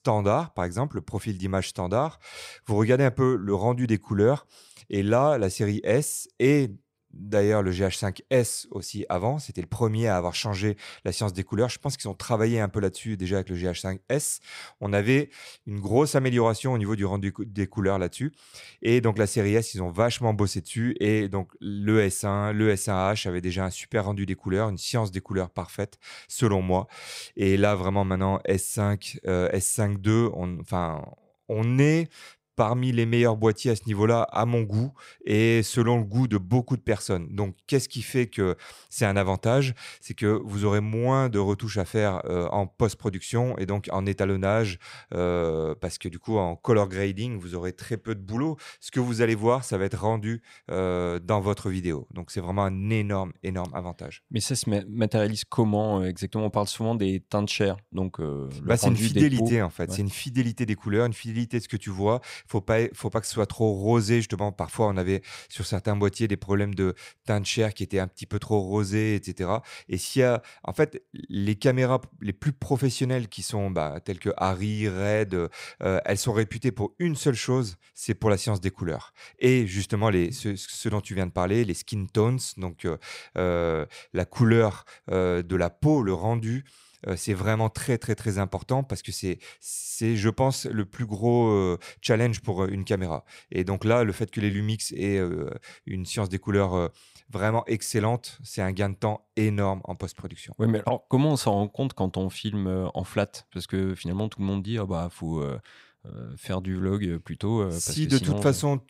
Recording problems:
none

